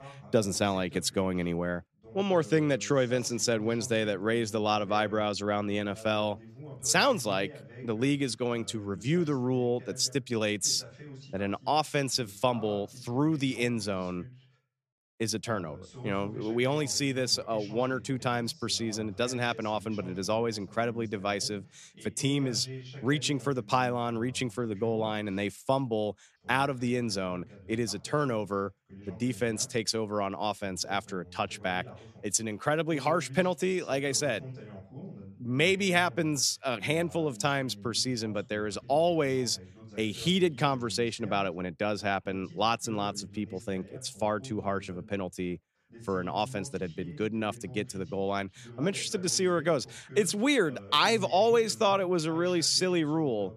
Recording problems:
voice in the background; noticeable; throughout; 20 dB below the speech

